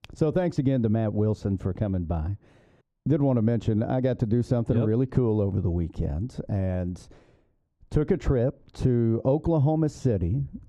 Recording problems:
muffled; very; fading above 1.5 kHz

